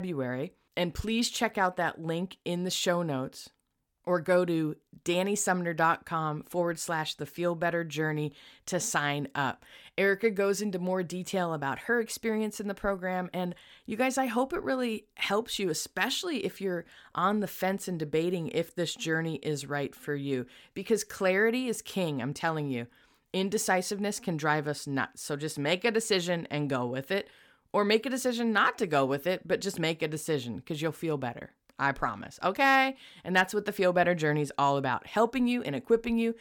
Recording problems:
abrupt cut into speech; at the start

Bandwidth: 18 kHz